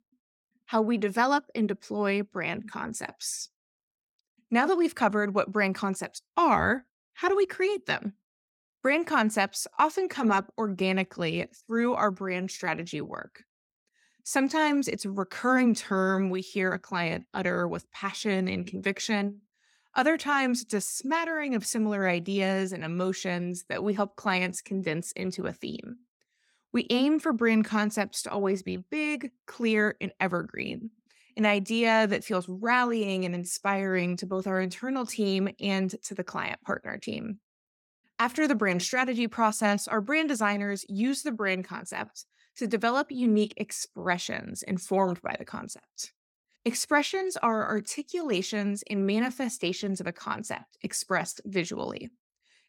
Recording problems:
none

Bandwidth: 17.5 kHz